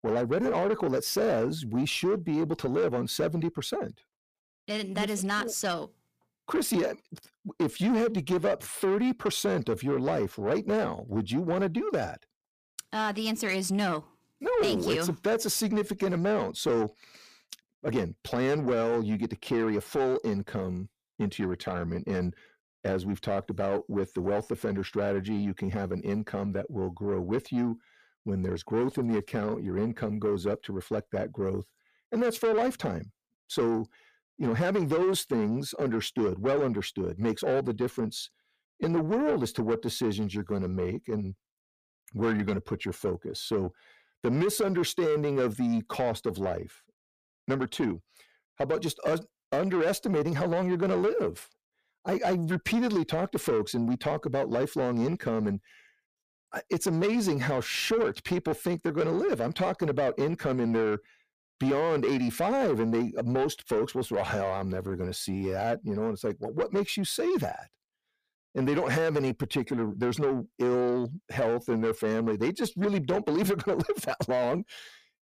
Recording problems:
distortion; slight; 10 dB below the speech

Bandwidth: 15 kHz